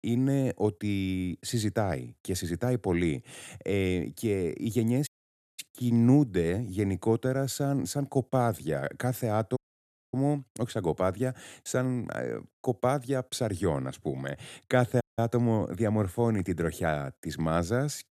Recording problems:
audio cutting out; at 5 s for 0.5 s, at 9.5 s for 0.5 s and at 15 s

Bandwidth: 14 kHz